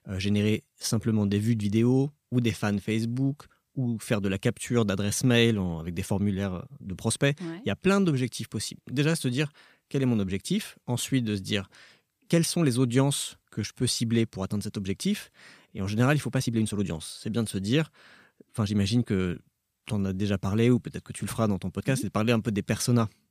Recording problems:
uneven, jittery; strongly; from 1 to 23 s

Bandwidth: 15 kHz